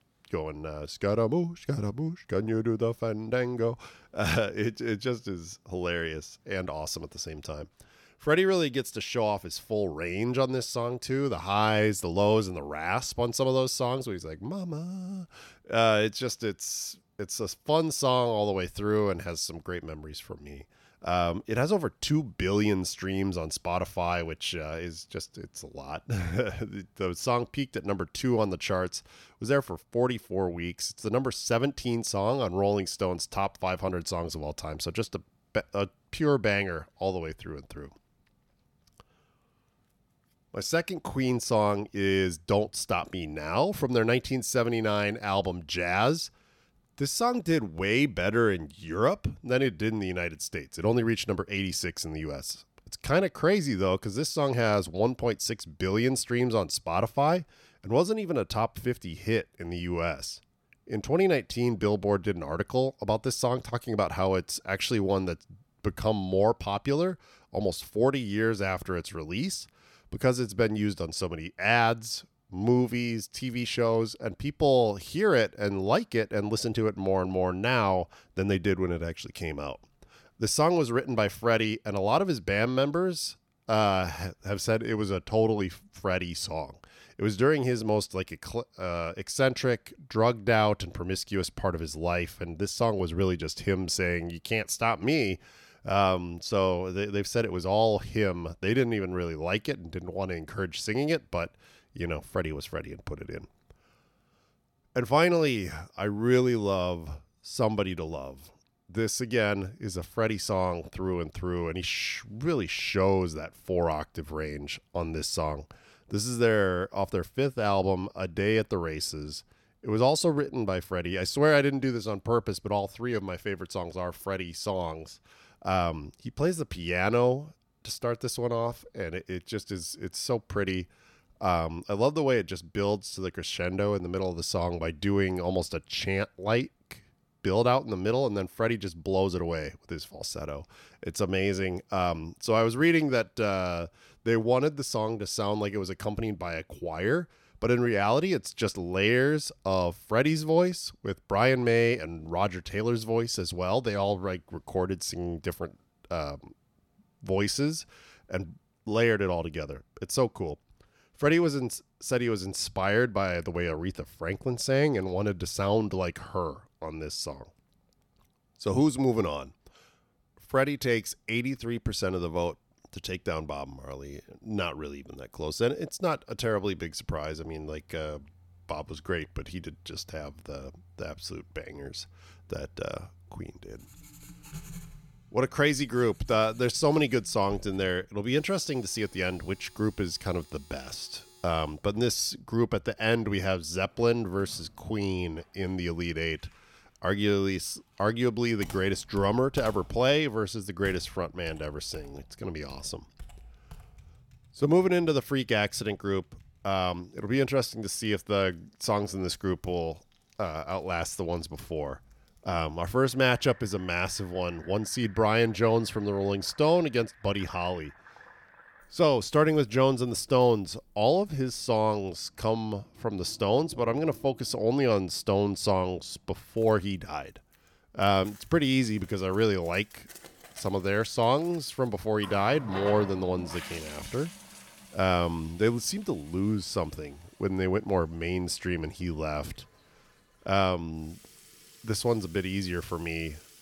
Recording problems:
household noises; faint; from 2:58 on; 20 dB below the speech

